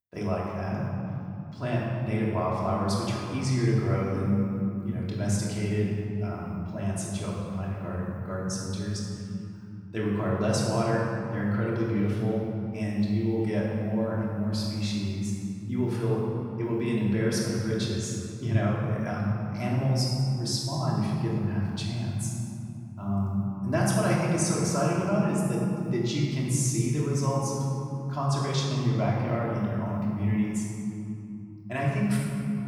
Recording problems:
room echo; strong; dies away in 2.9 s
off-mic speech; far

